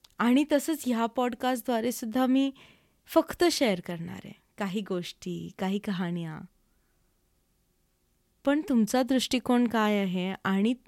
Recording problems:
none

